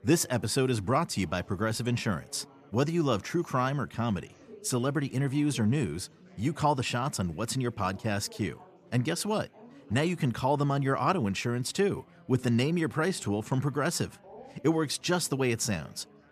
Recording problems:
chatter from many people; faint; throughout; 25 dB below the speech

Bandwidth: 14.5 kHz